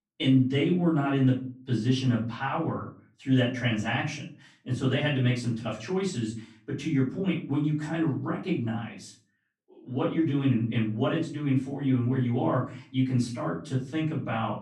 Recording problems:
off-mic speech; far
room echo; slight; dies away in 0.3 s

